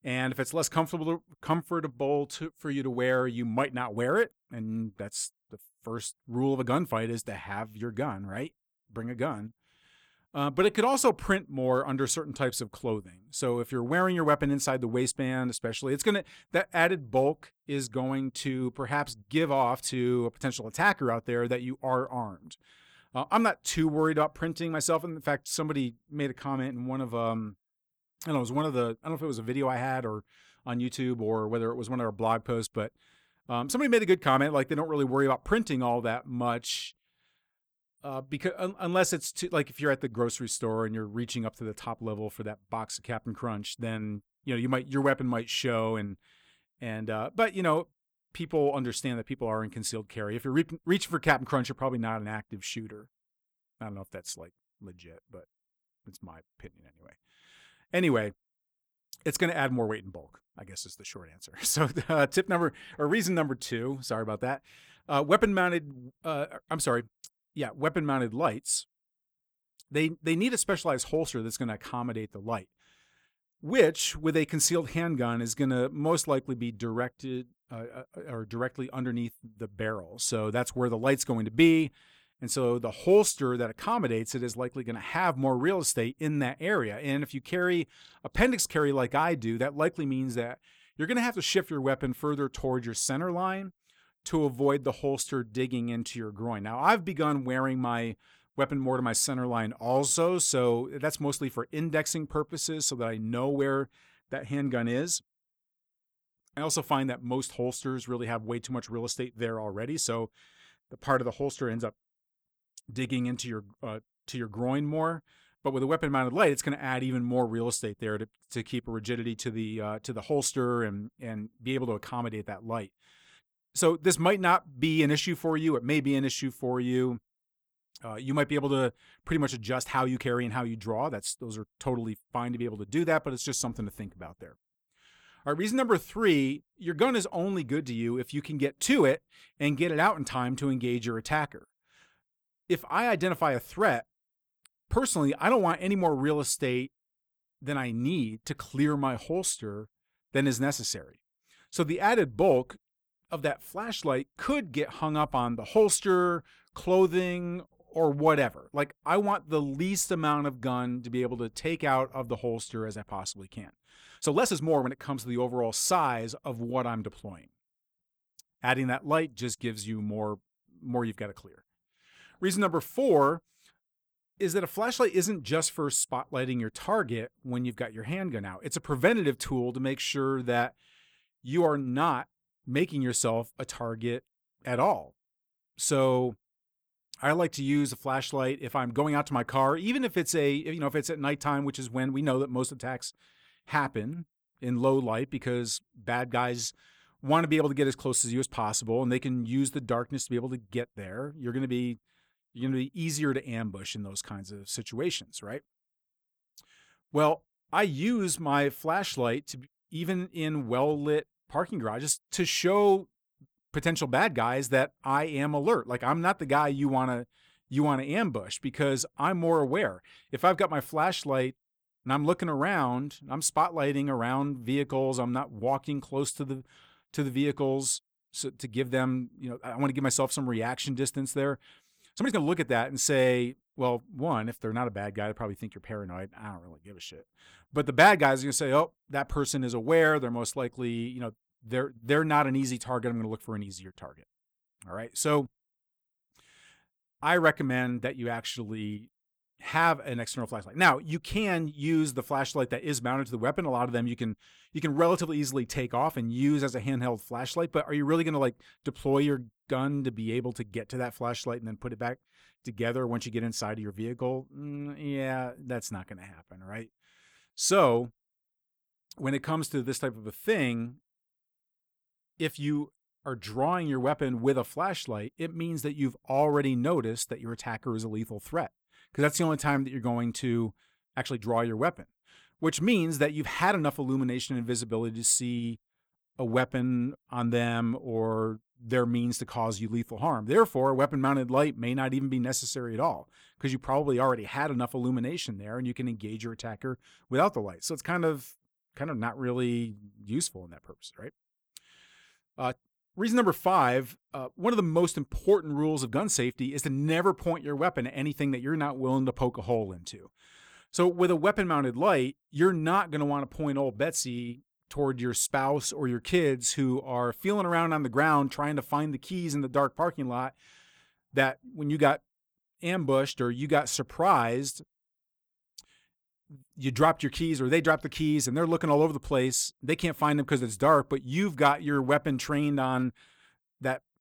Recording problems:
uneven, jittery; strongly; from 1:17 to 5:09

